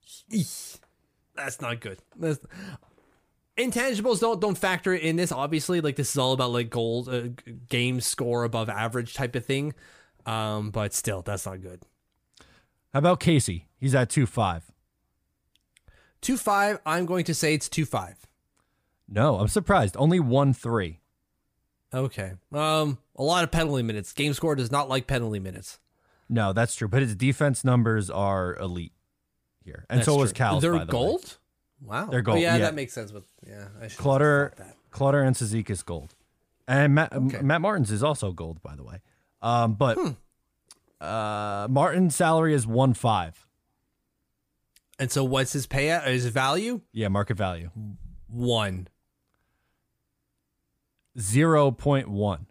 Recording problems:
none

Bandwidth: 15 kHz